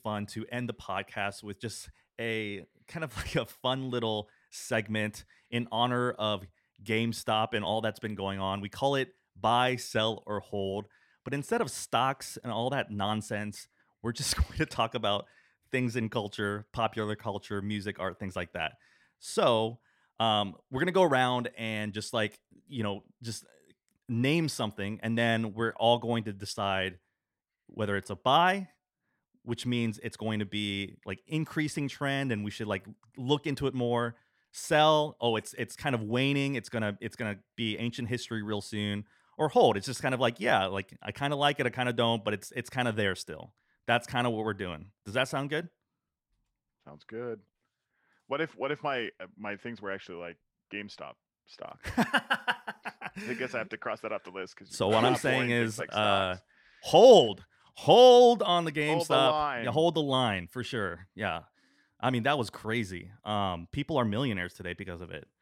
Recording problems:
none

